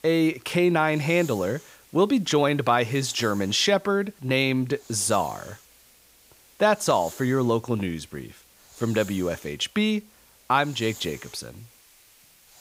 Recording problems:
hiss; faint; throughout; 25 dB below the speech

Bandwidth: 15.5 kHz